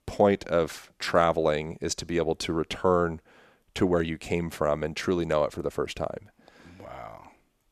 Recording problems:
none

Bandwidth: 14 kHz